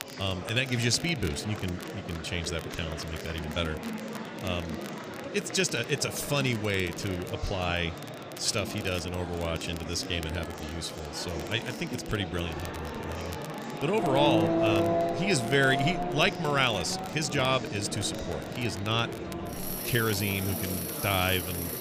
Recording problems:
traffic noise; loud; from 14 s on; 3 dB below the speech
murmuring crowd; loud; throughout; 9 dB below the speech
crackle, like an old record; noticeable; 20 dB below the speech

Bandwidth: 15 kHz